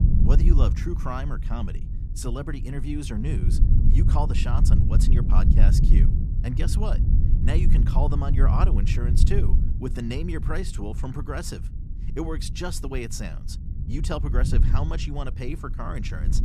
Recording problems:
low rumble; loud; throughout; 5 dB below the speech

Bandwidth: 14.5 kHz